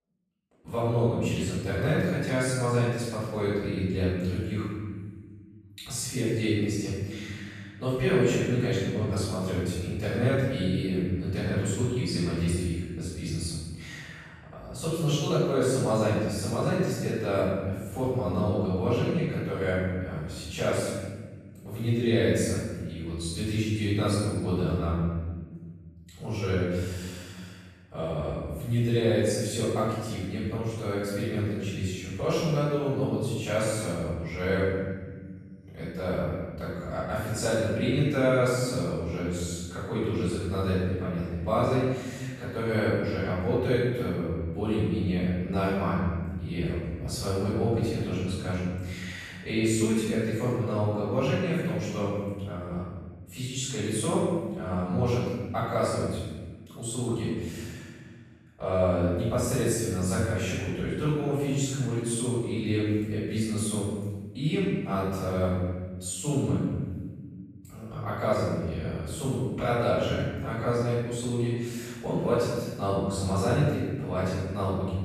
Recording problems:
room echo; strong; dies away in 1.4 s
off-mic speech; far

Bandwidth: 14 kHz